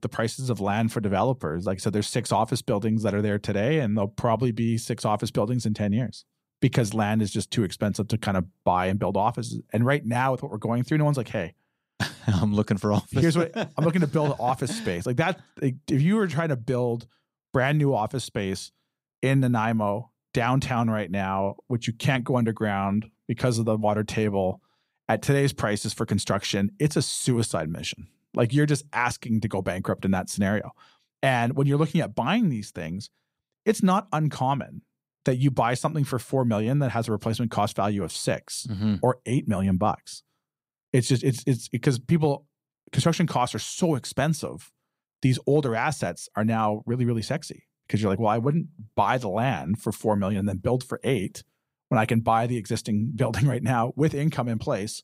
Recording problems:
none

